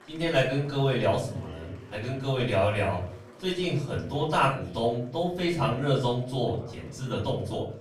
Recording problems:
off-mic speech; far
room echo; slight; dies away in 0.5 s
murmuring crowd; faint; throughout; 20 dB below the speech

